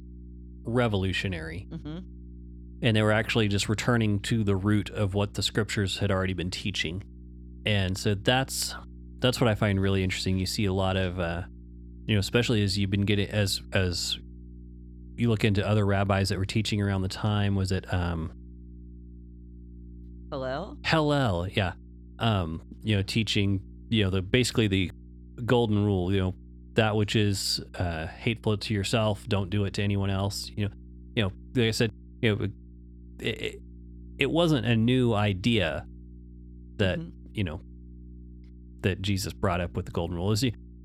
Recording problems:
electrical hum; faint; throughout; 60 Hz, 30 dB below the speech

